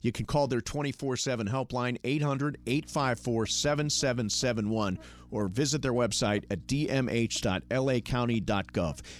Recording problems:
electrical hum; faint; from 2.5 s on; 60 Hz, 30 dB below the speech

